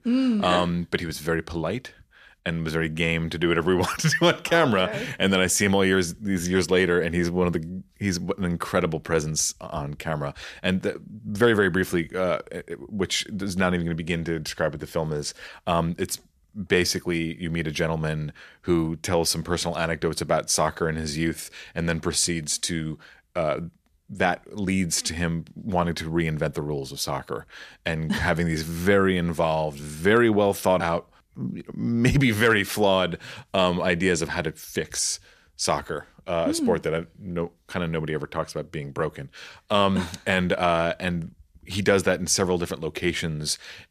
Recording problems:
none

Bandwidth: 14.5 kHz